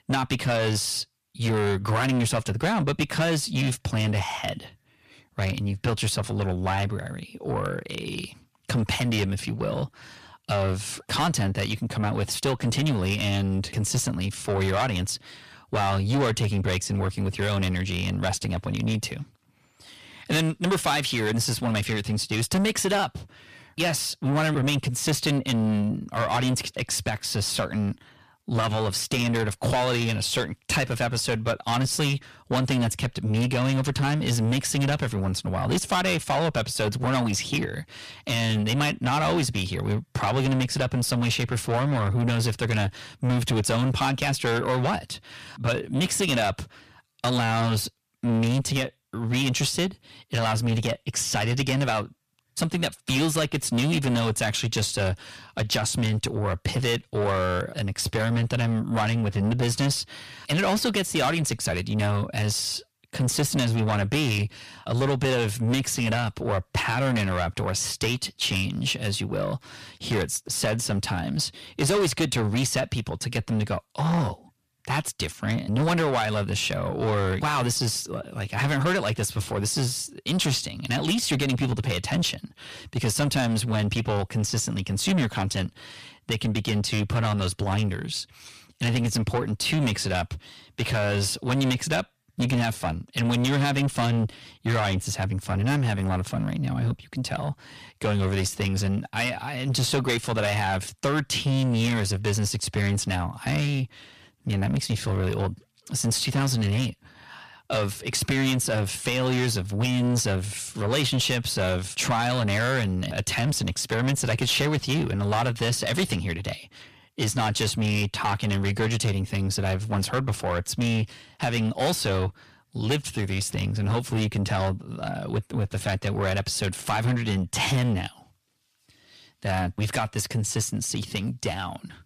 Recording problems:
distortion; heavy; 6 dB below the speech

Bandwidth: 14.5 kHz